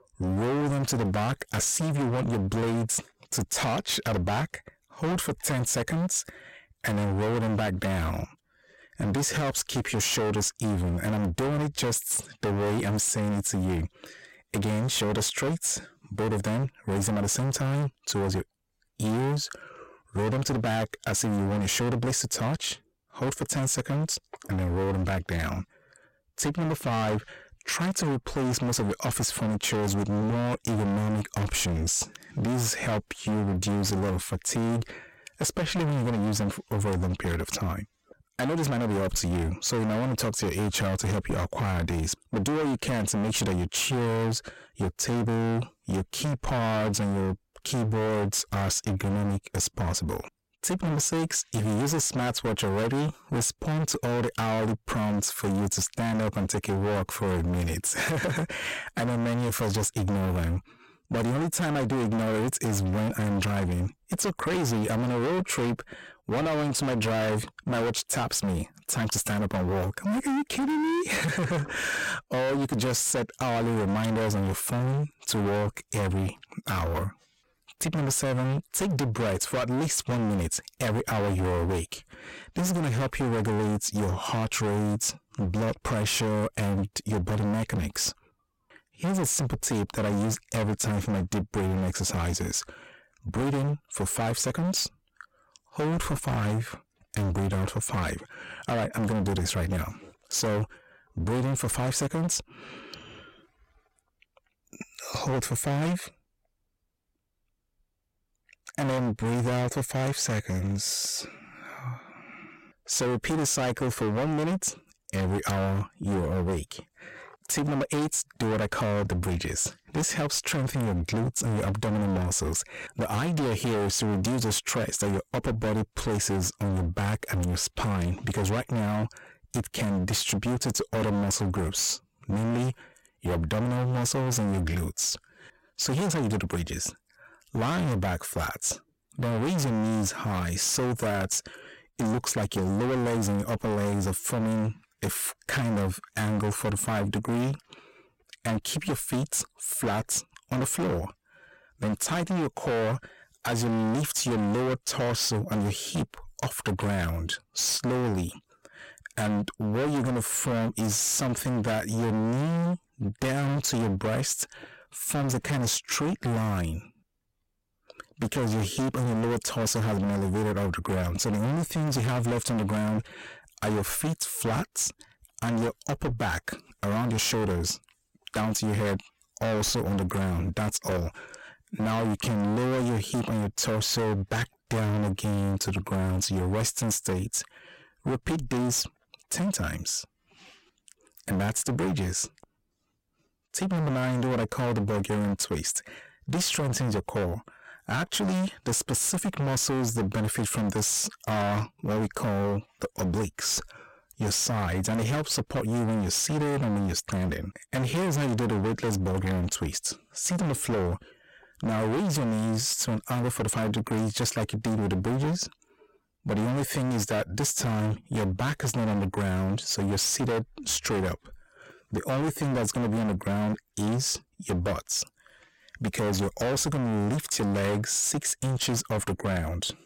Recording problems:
distortion; heavy; 33% of the sound clipped

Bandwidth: 16.5 kHz